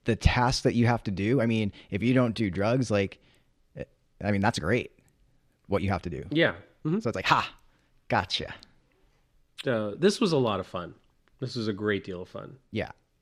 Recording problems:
uneven, jittery; strongly; from 1 to 10 s

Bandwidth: 14.5 kHz